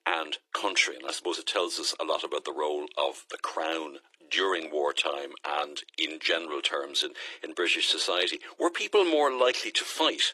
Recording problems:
thin; very; fading below 350 Hz
garbled, watery; slightly

